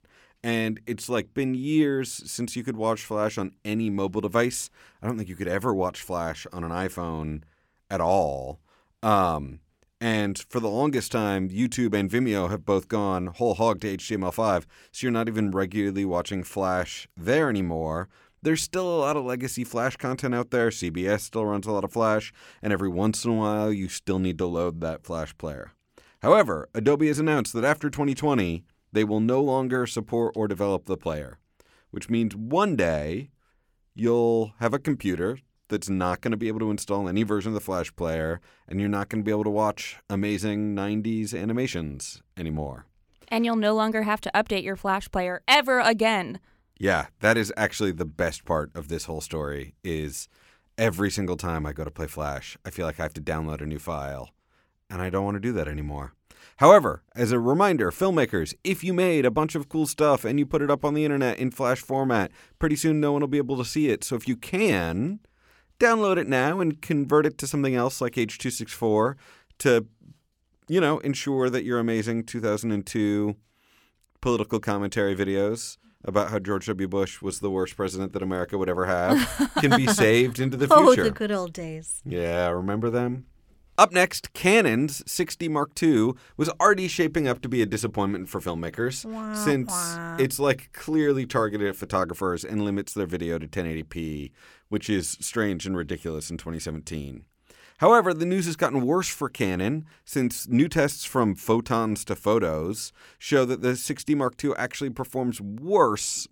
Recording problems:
none

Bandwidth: 17 kHz